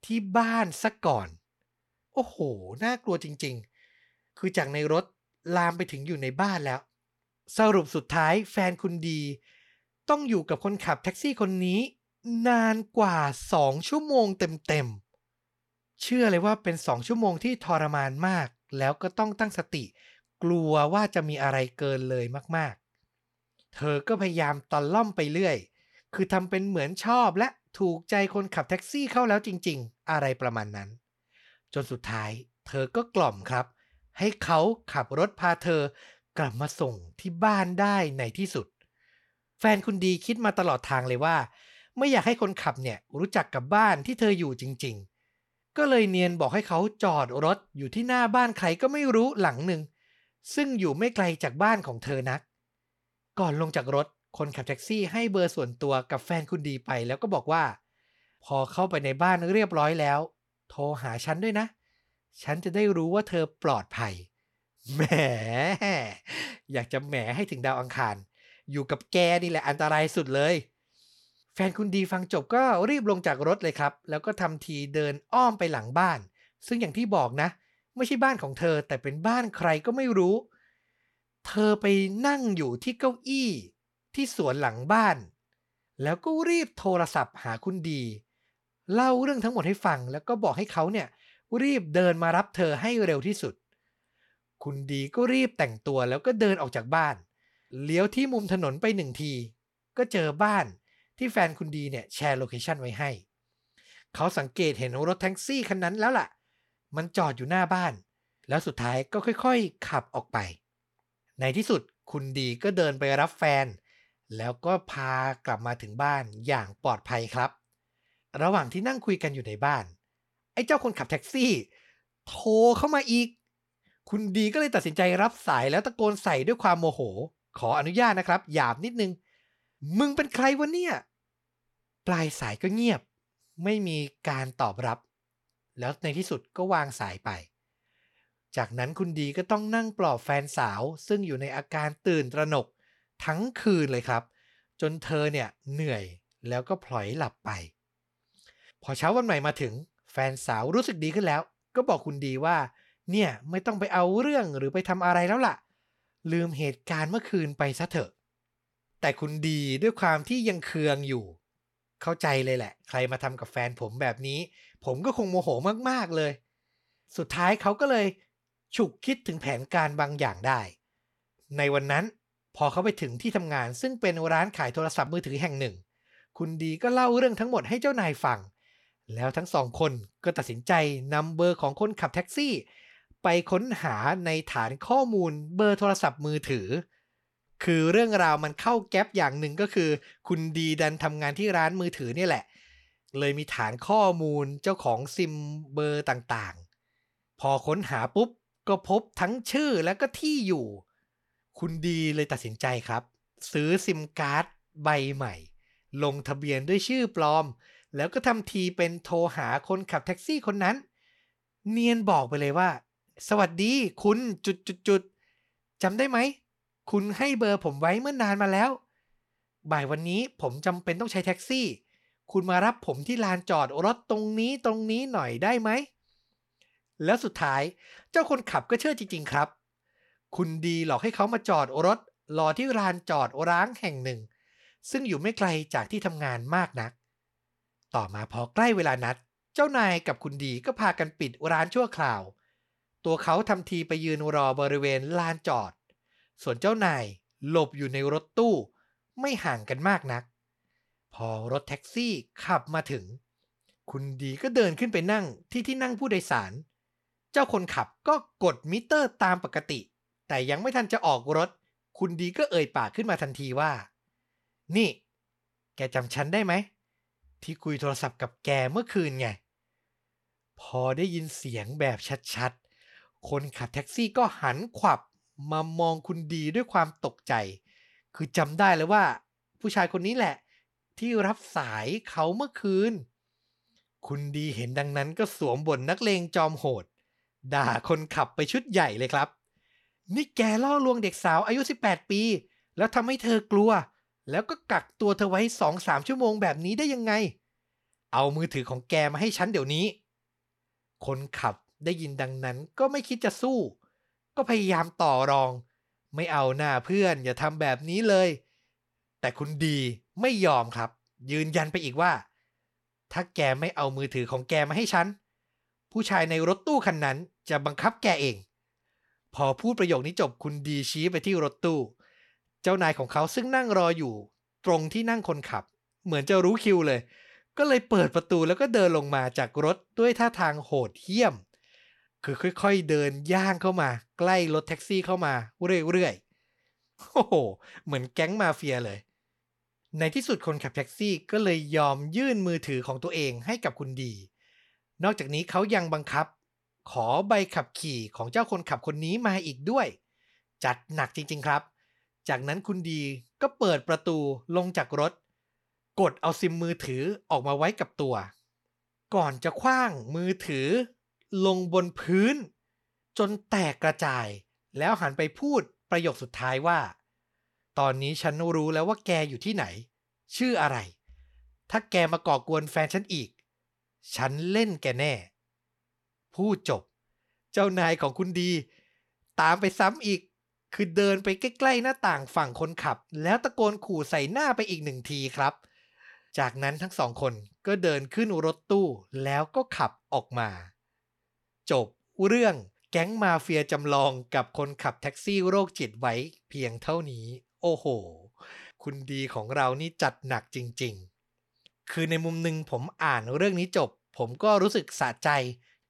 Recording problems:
none

